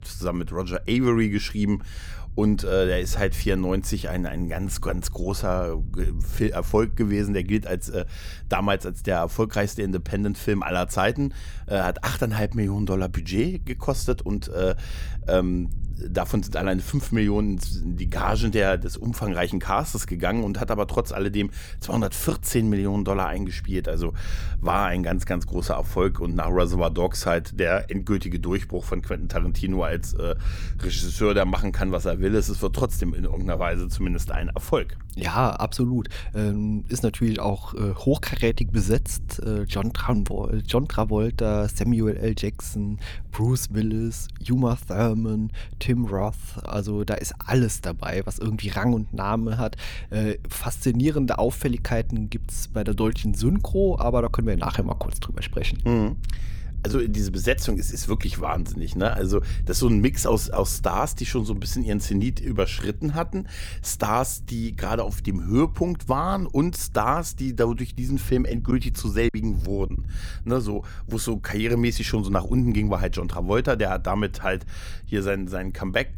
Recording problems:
low rumble; faint; throughout; 25 dB below the speech
choppy; very; from 1:09 to 1:10; 8% of the speech affected

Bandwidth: 18.5 kHz